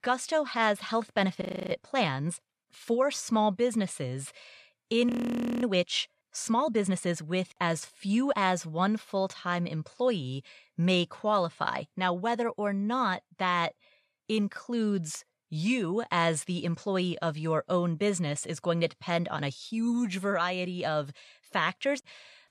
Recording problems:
audio freezing; at 1.5 s and at 5 s for 0.5 s

